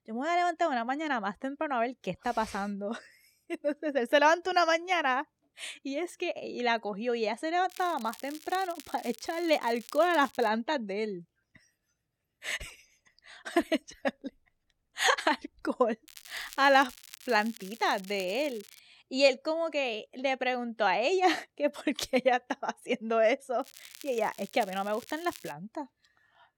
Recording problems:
crackling; noticeable; from 7.5 to 10 s, from 16 to 19 s and from 24 to 26 s; 20 dB below the speech

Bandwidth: 18 kHz